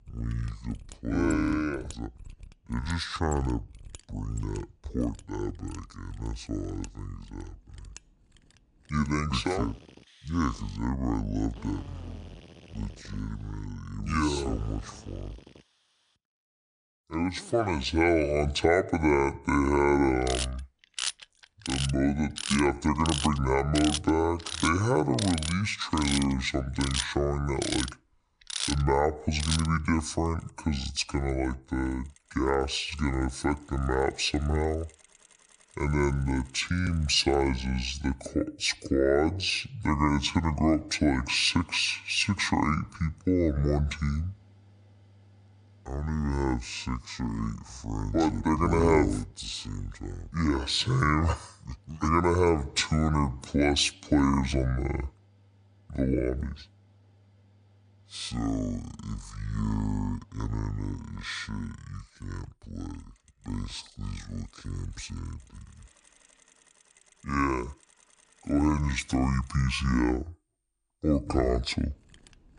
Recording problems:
wrong speed and pitch; too slow and too low; 0.6 times normal speed
machinery noise; loud; throughout; 9 dB below the speech

